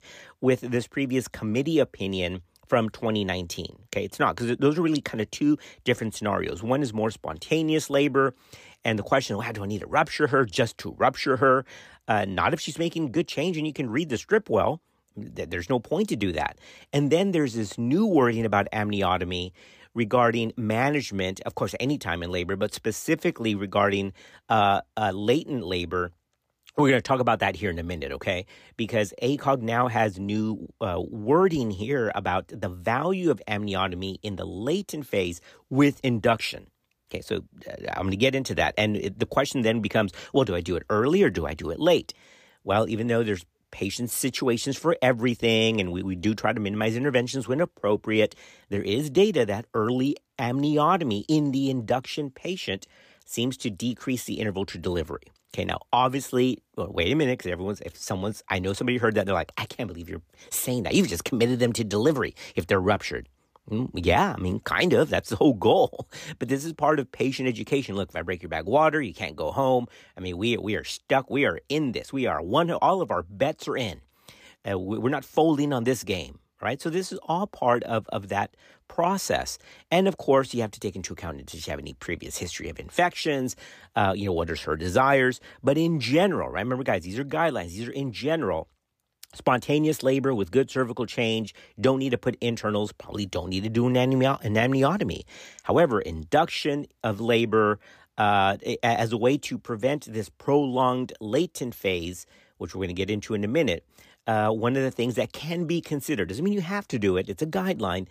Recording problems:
none

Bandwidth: 15 kHz